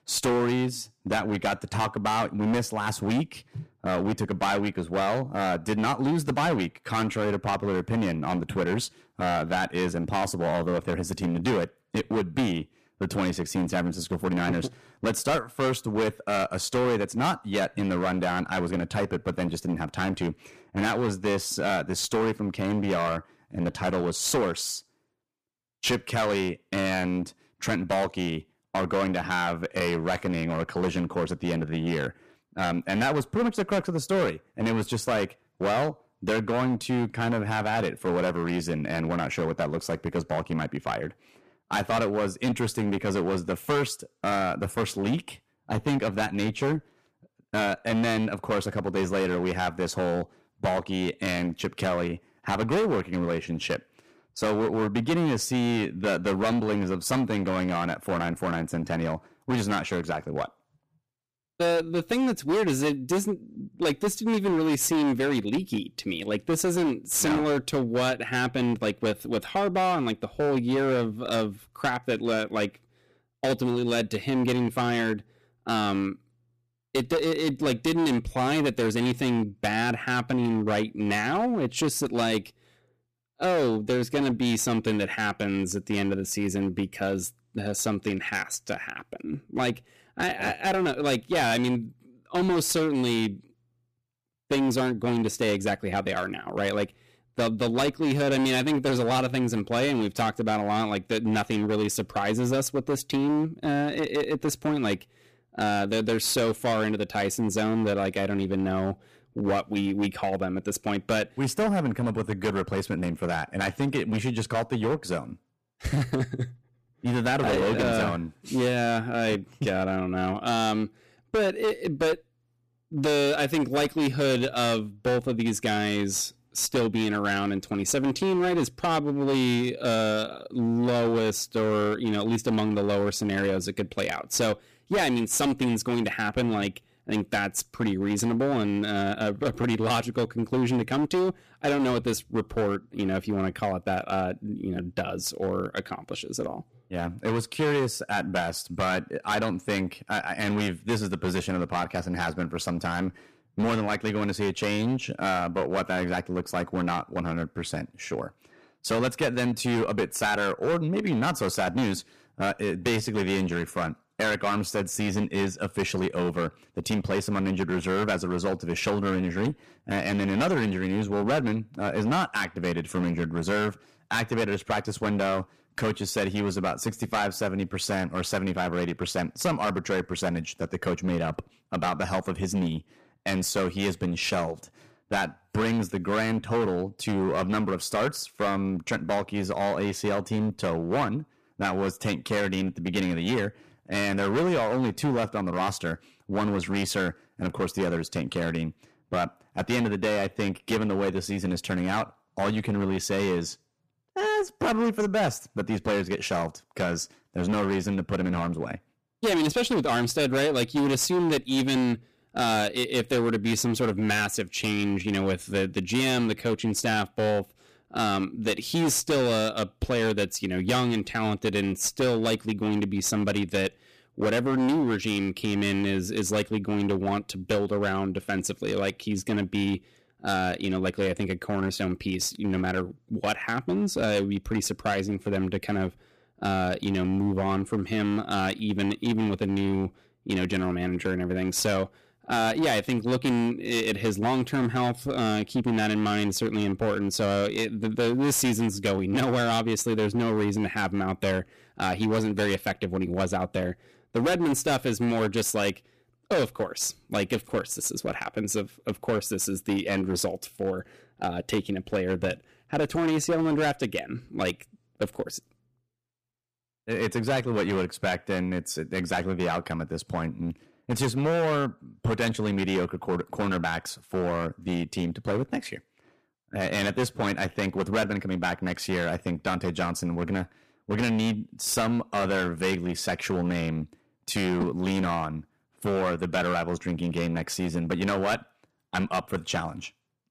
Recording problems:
distortion; heavy; 14% of the sound clipped

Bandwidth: 15 kHz